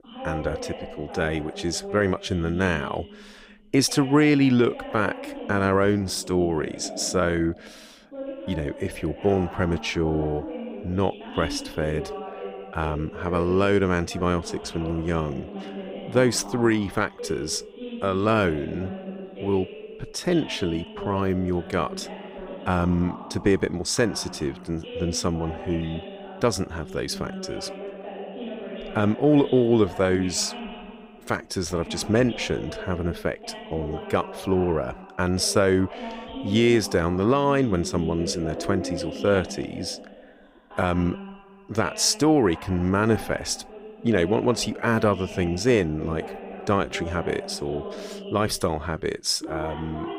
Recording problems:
voice in the background; noticeable; throughout; 10 dB below the speech

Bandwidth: 15.5 kHz